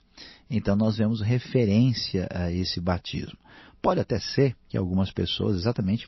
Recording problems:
garbled, watery; slightly; nothing above 5.5 kHz

